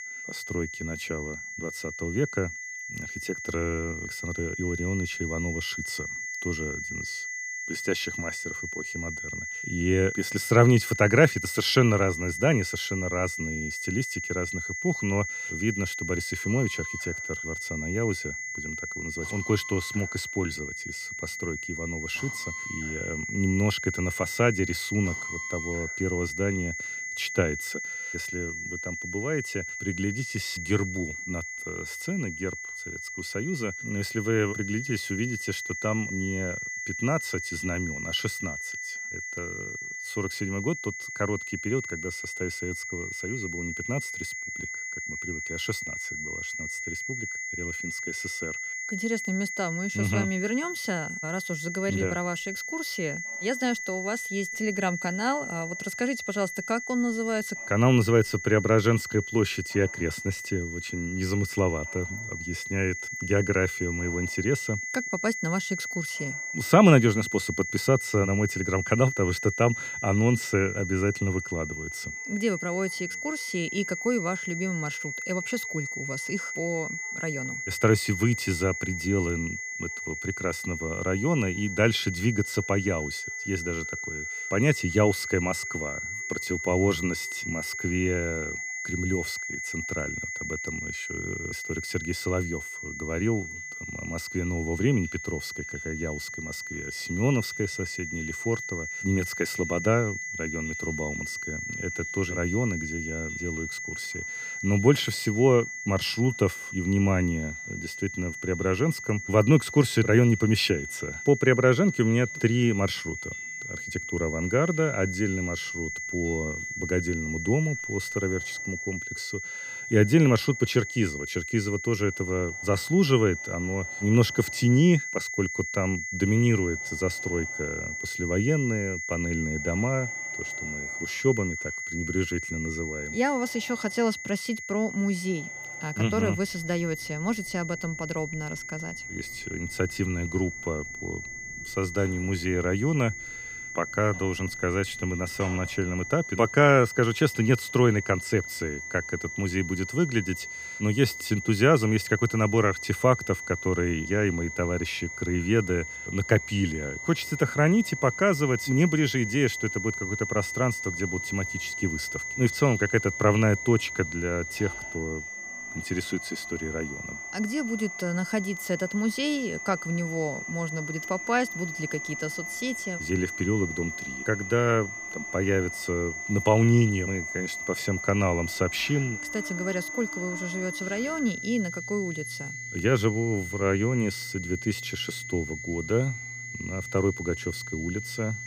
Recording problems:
high-pitched whine; loud; throughout; 2 kHz, 6 dB below the speech
machinery noise; faint; throughout; 25 dB below the speech

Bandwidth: 15 kHz